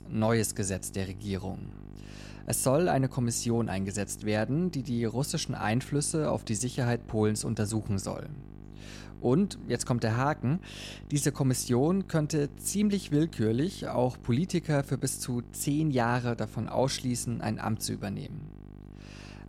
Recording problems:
electrical hum; faint; throughout; 50 Hz, 20 dB below the speech

